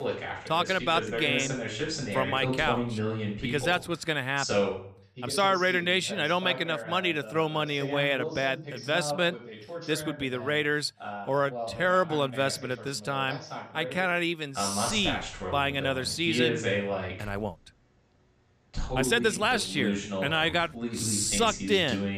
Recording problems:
voice in the background; loud; throughout; 6 dB below the speech
uneven, jittery; strongly; from 5 to 21 s

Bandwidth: 14.5 kHz